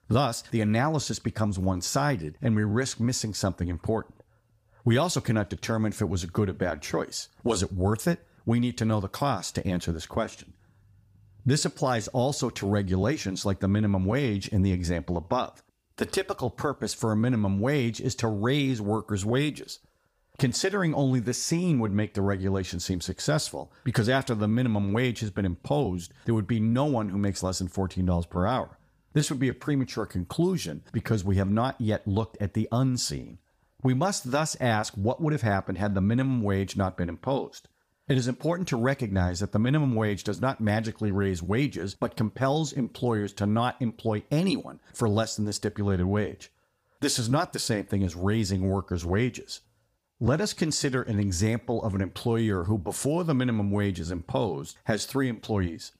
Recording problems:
none

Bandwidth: 15 kHz